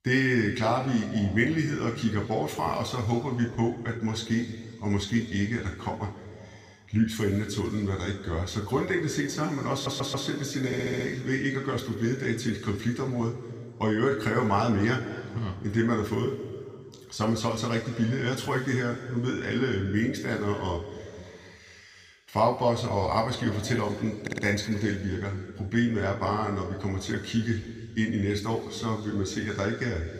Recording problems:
room echo; noticeable; dies away in 2 s
off-mic speech; somewhat distant
audio stuttering; at 9.5 s, at 11 s and at 24 s

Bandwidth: 15 kHz